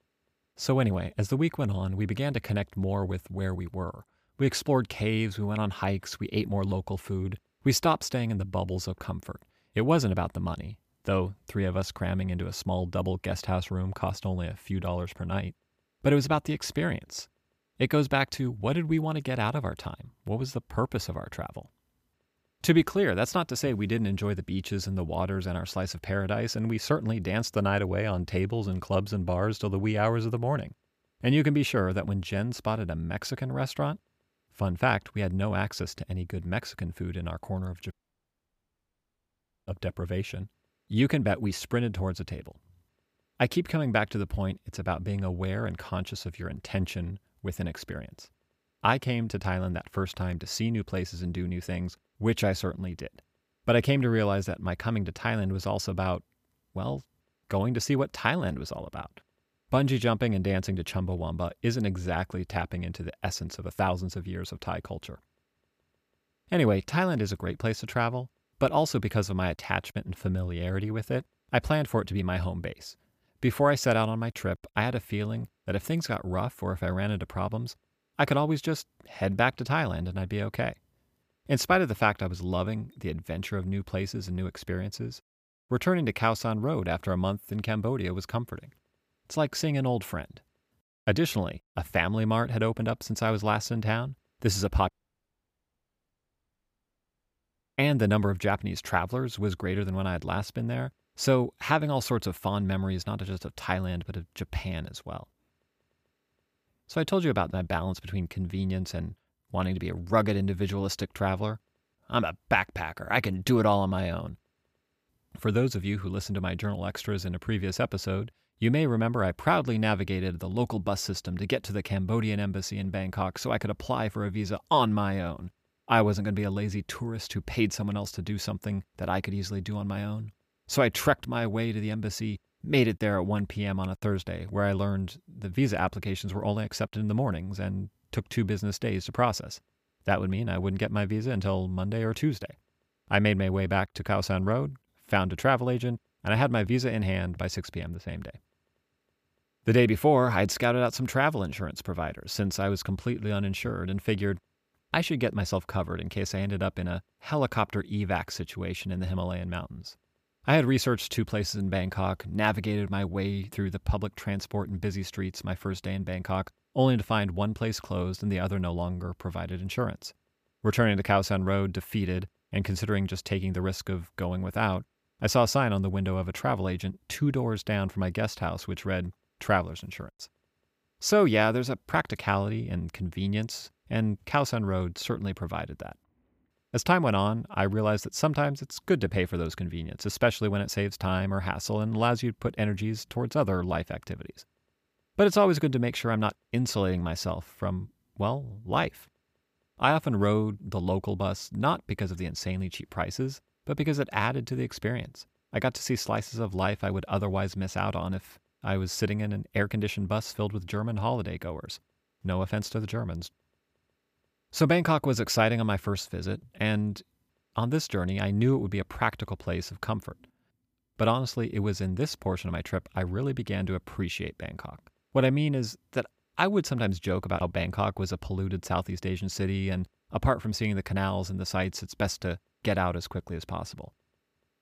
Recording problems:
audio cutting out; at 38 s for 2 s and at 1:35 for 3 s

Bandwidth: 15 kHz